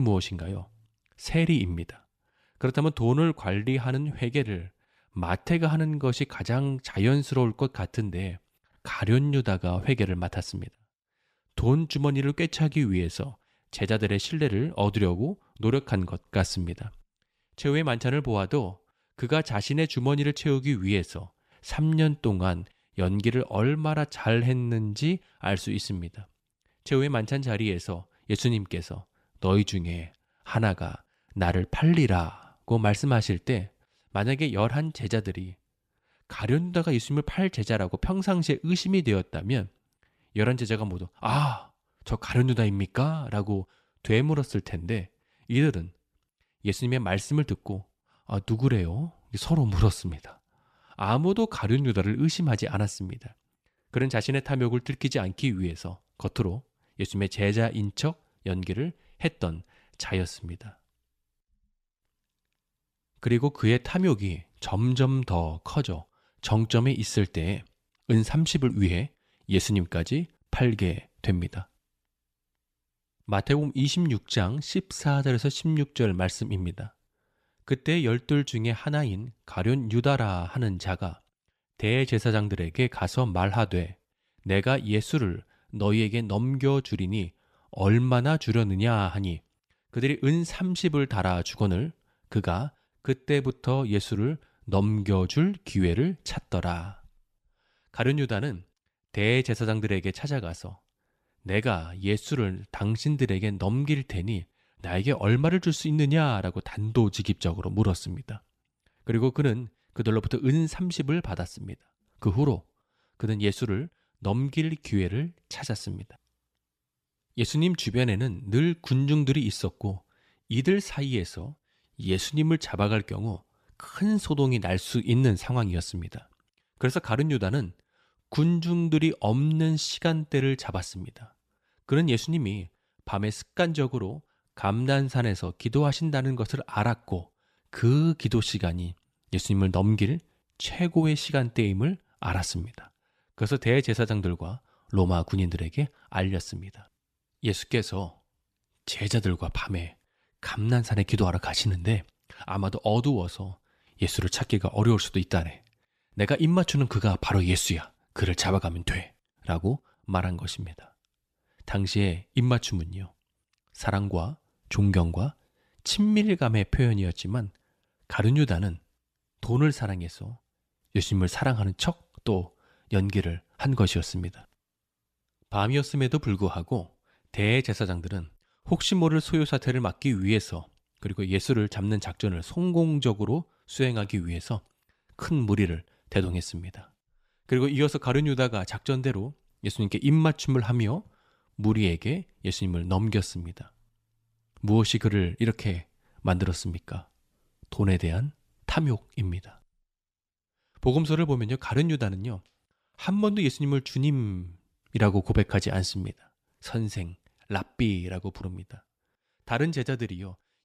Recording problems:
abrupt cut into speech; at the start

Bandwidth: 14.5 kHz